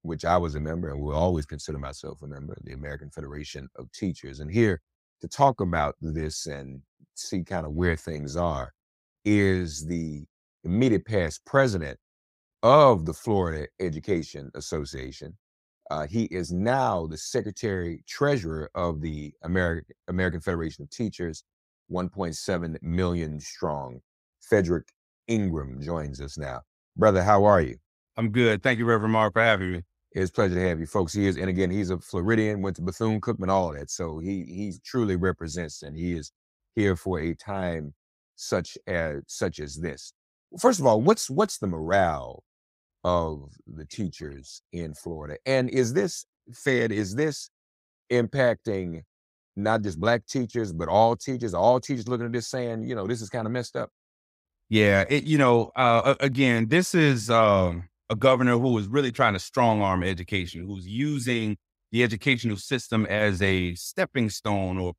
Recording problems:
none

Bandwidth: 15.5 kHz